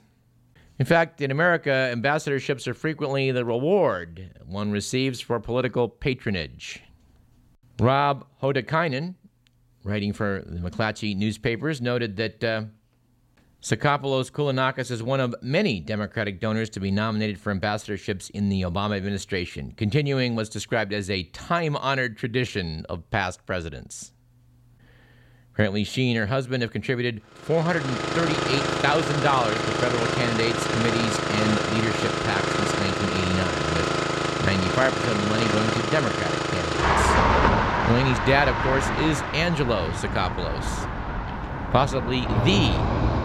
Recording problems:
traffic noise; very loud; from 28 s on; 1 dB above the speech

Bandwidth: 16 kHz